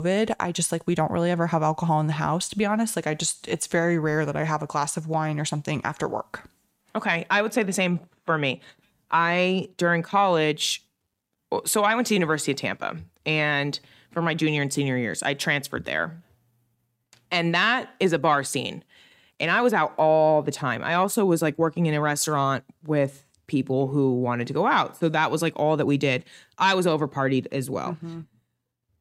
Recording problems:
abrupt cut into speech; at the start

